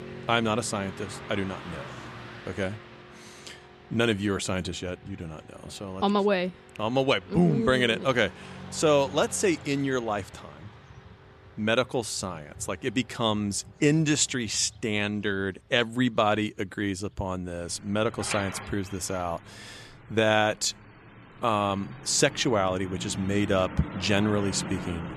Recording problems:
traffic noise; noticeable; throughout; 15 dB below the speech

